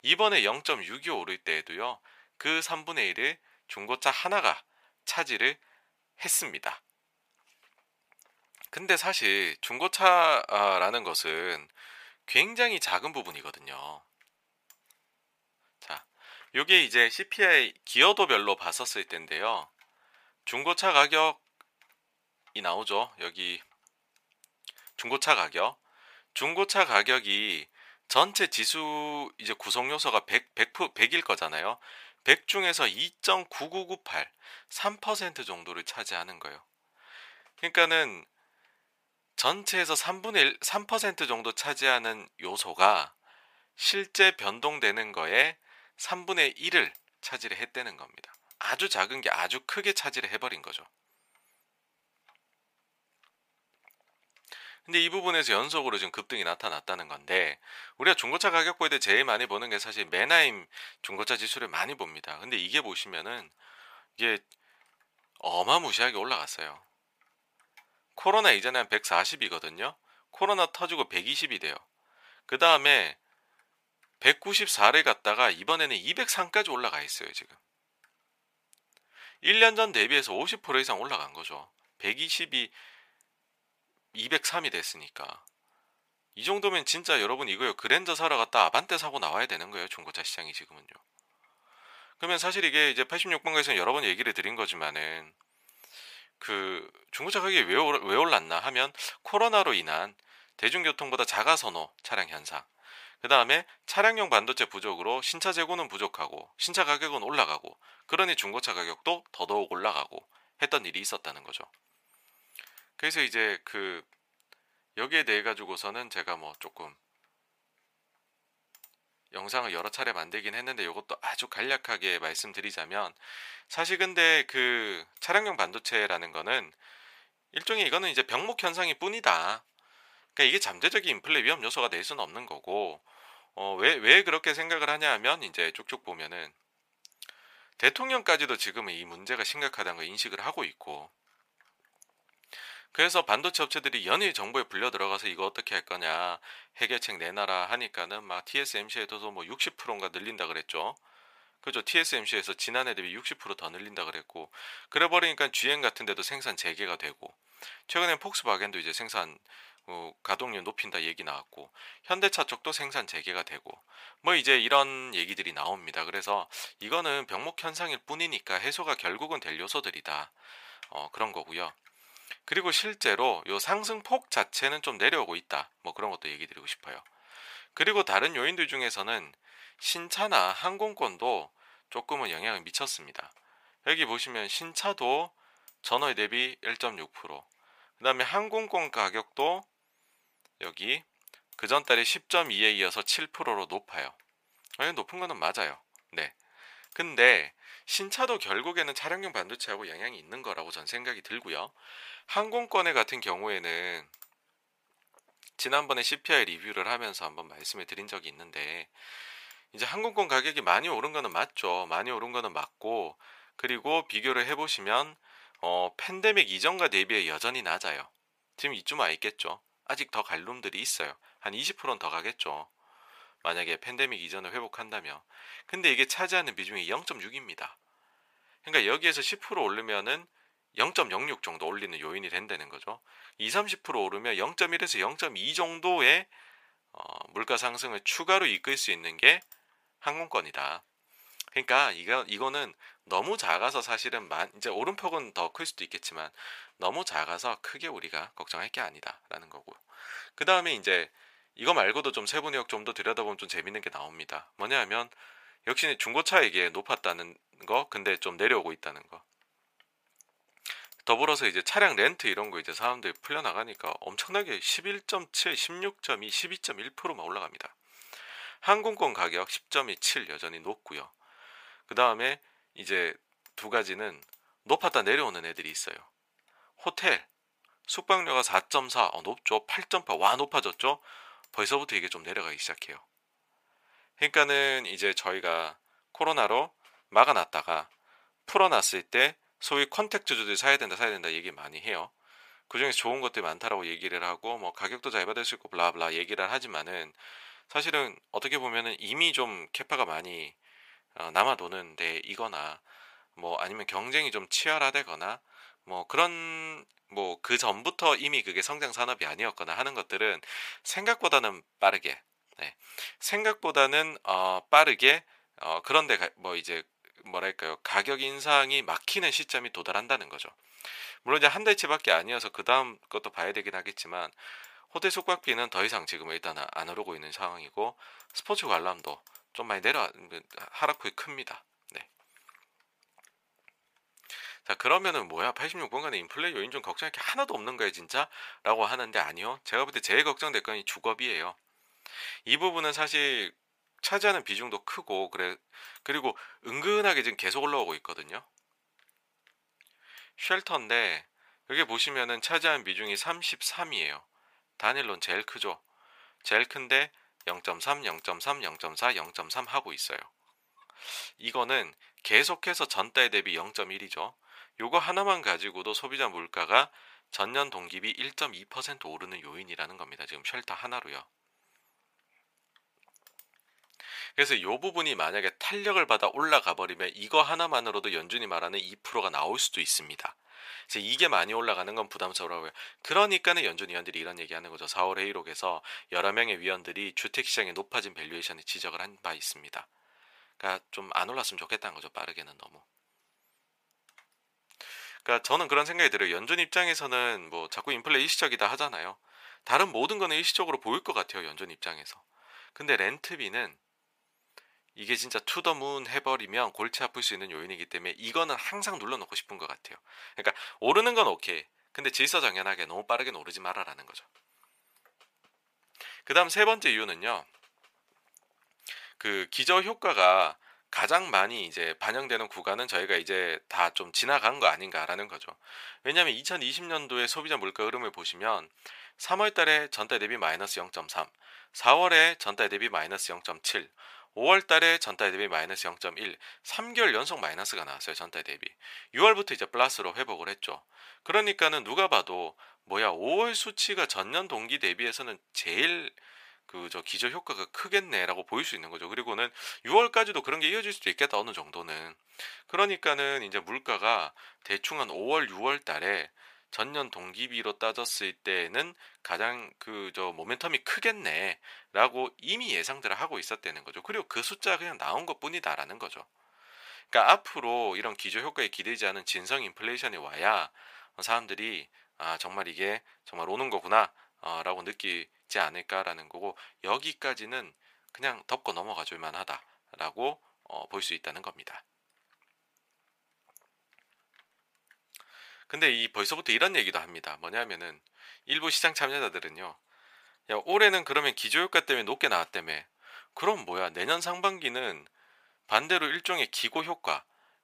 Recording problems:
thin; very; fading below 750 Hz

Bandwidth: 15 kHz